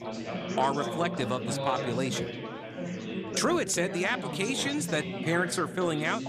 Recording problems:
chatter from many people; loud; throughout; 5 dB below the speech

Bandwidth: 14.5 kHz